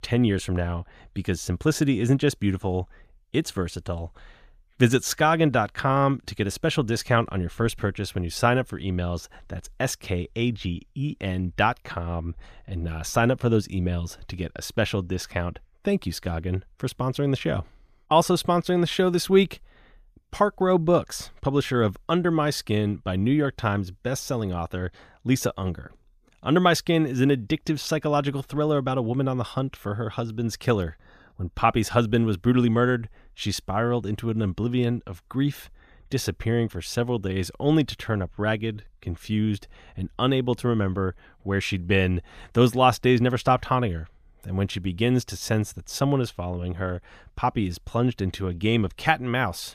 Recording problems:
none

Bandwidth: 14.5 kHz